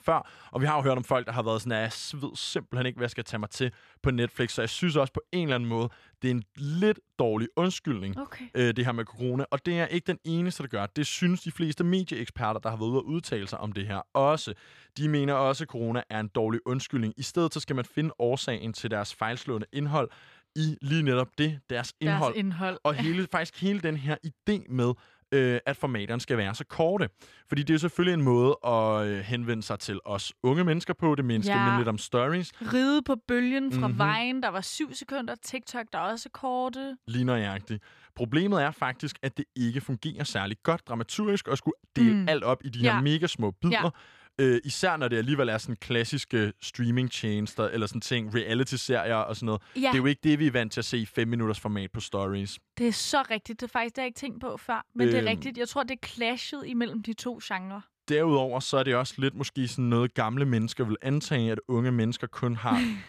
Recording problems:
none

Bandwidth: 14.5 kHz